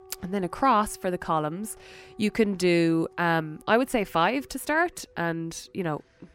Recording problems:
background music; faint; throughout; 25 dB below the speech

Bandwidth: 16 kHz